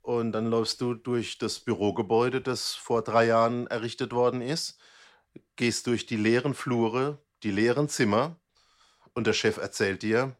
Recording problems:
none

